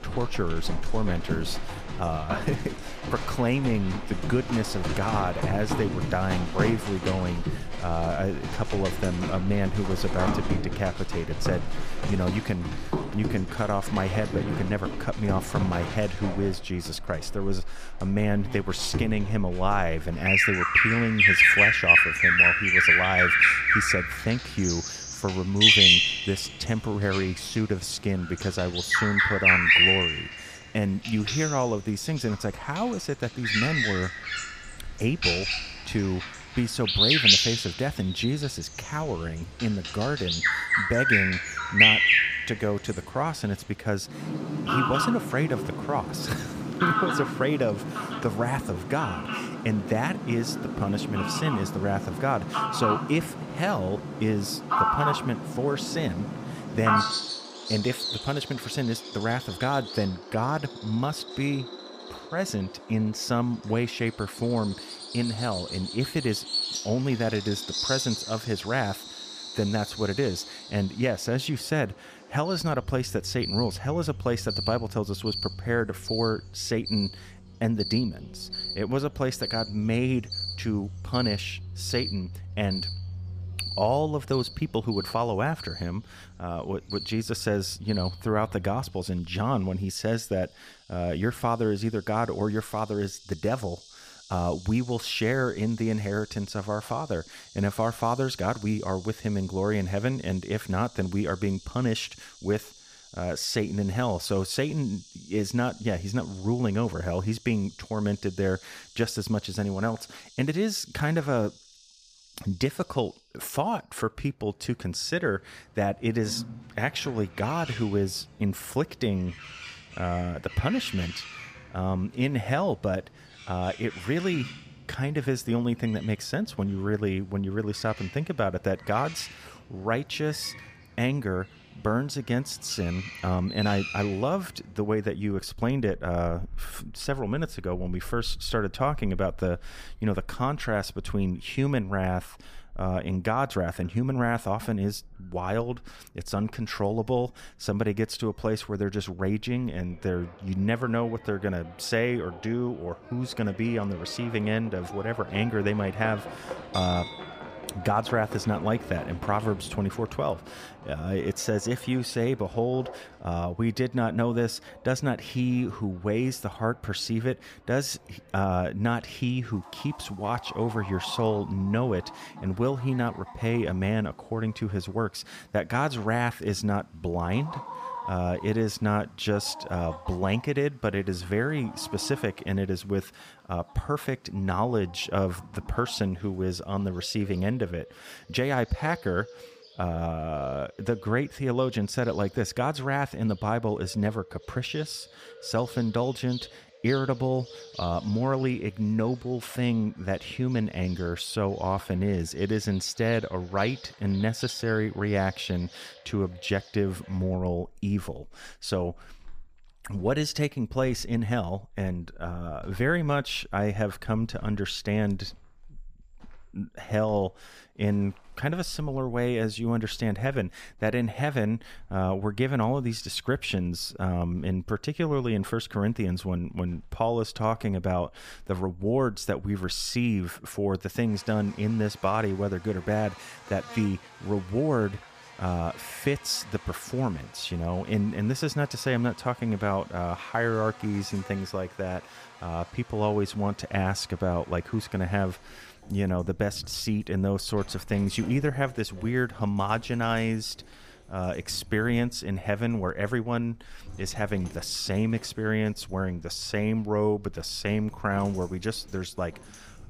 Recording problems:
animal sounds; very loud; throughout; 2 dB above the speech

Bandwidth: 15 kHz